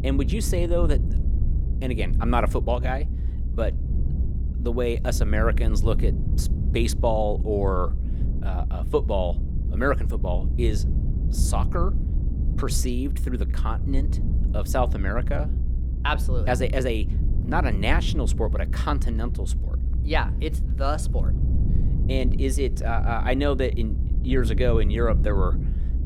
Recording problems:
low rumble; noticeable; throughout; 15 dB below the speech

